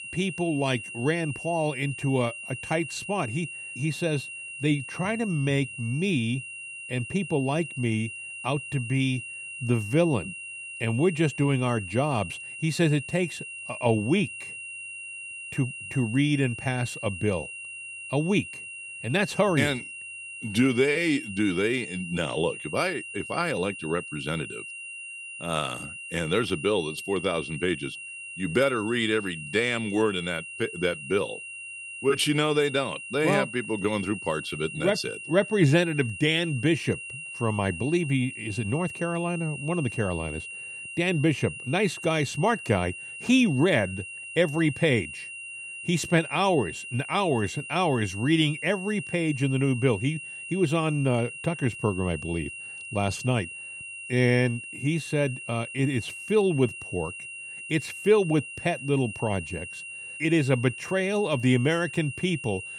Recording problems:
high-pitched whine; loud; throughout; 3 kHz, 10 dB below the speech

